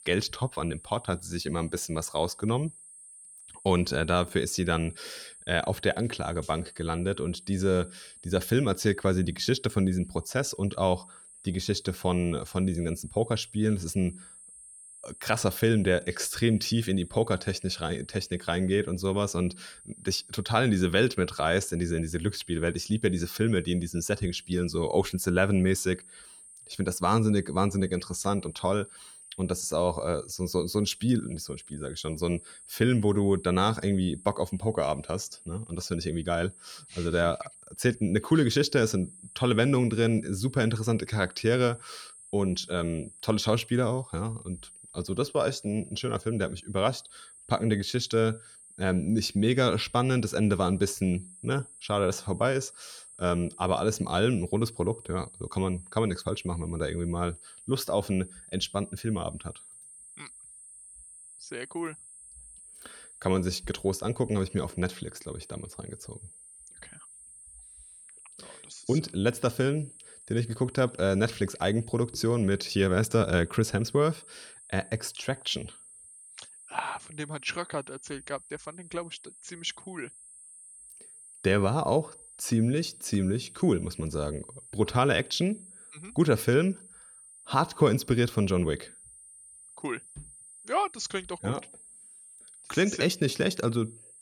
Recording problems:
high-pitched whine; noticeable; throughout; 8.5 kHz, 20 dB below the speech

